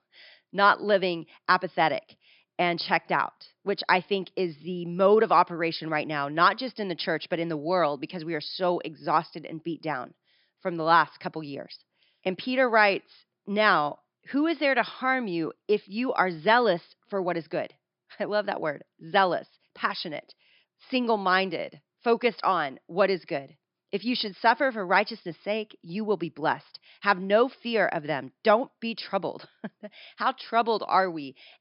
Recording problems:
high frequencies cut off; noticeable; nothing above 5.5 kHz

